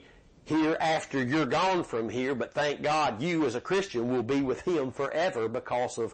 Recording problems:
distortion; heavy; 17% of the sound clipped
garbled, watery; slightly; nothing above 8 kHz

